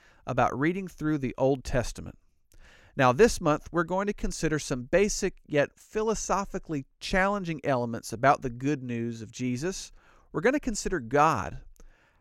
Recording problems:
none

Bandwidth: 16 kHz